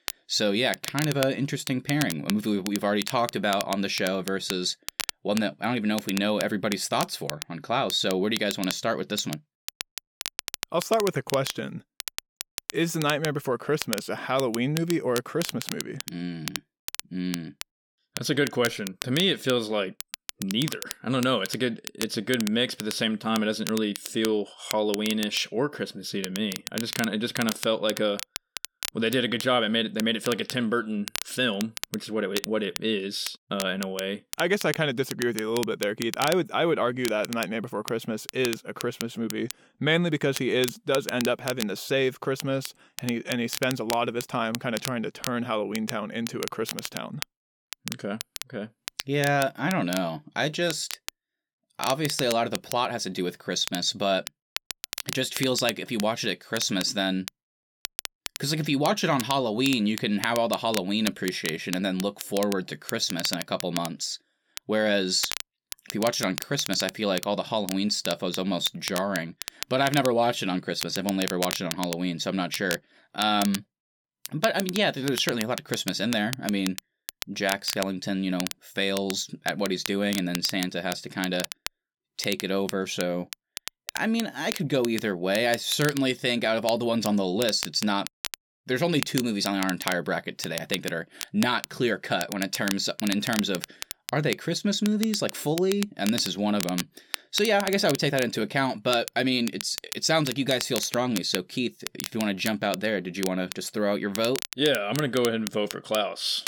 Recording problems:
crackle, like an old record; loud; 9 dB below the speech

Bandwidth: 17.5 kHz